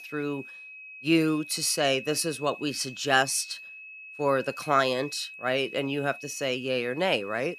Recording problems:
high-pitched whine; noticeable; throughout; 2.5 kHz, 15 dB below the speech

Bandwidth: 14.5 kHz